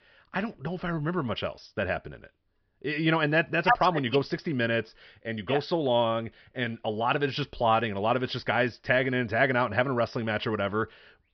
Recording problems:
high frequencies cut off; noticeable; nothing above 5.5 kHz

